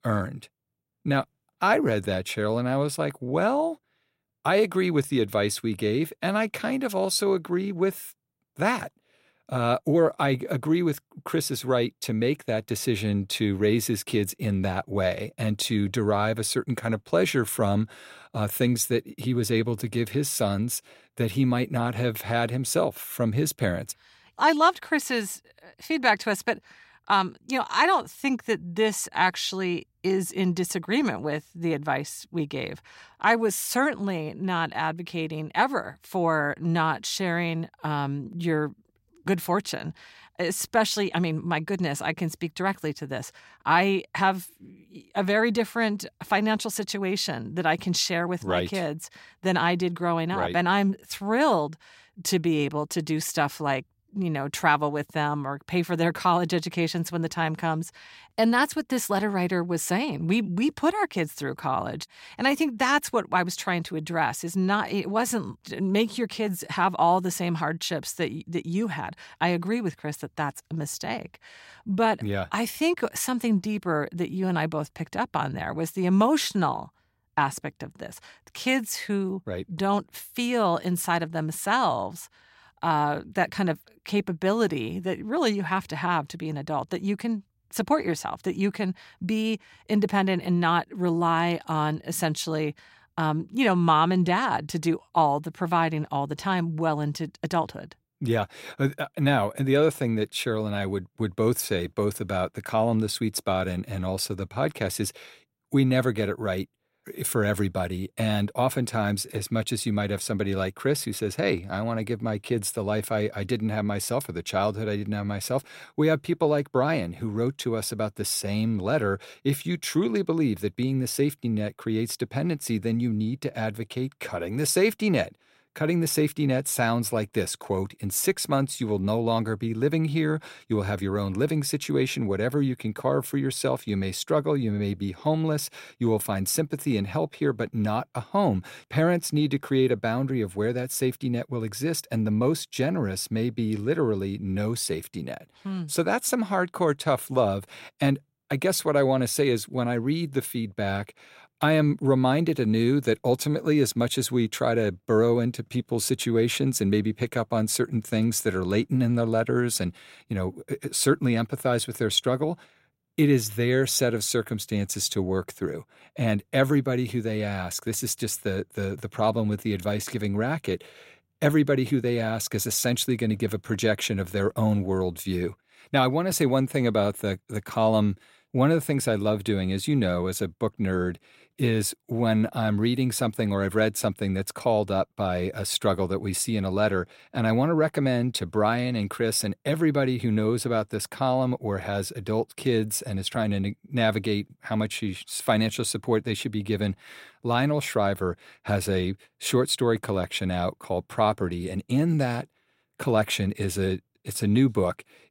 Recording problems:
none

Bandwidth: 16 kHz